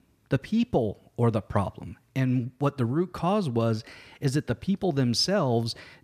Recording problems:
none

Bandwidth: 14.5 kHz